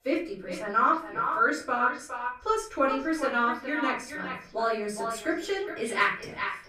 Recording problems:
echo of what is said; strong; throughout; 410 ms later, 7 dB below the speech
off-mic speech; far
room echo; slight; dies away in 0.4 s

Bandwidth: 15 kHz